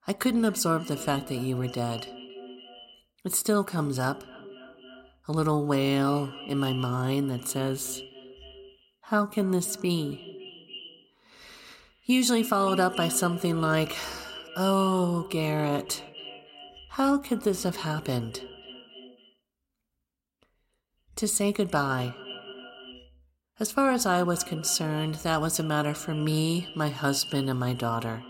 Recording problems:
echo of what is said; noticeable; throughout; 280 ms later, 15 dB below the speech

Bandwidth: 16 kHz